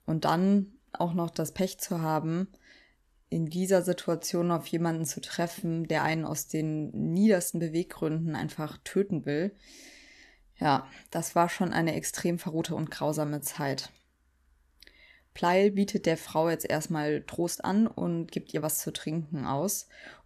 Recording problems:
uneven, jittery; strongly; from 1 to 19 s

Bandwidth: 13.5 kHz